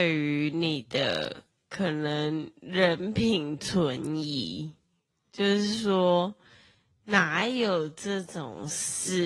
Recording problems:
wrong speed, natural pitch; too slow; 0.5 times normal speed
garbled, watery; slightly
abrupt cut into speech; at the start and the end

